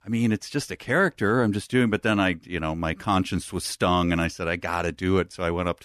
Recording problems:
none

